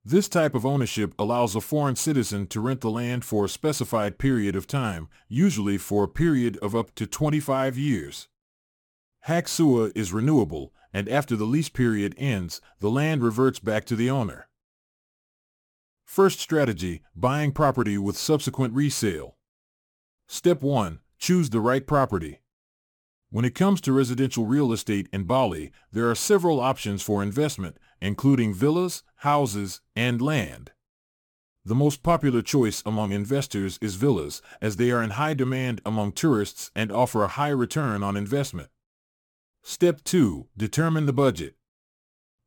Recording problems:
none

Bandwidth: 18 kHz